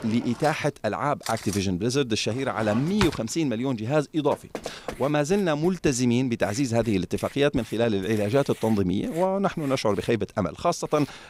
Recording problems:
household noises; noticeable; throughout; 15 dB below the speech
door banging; faint; at 4.5 s; peak 10 dB below the speech

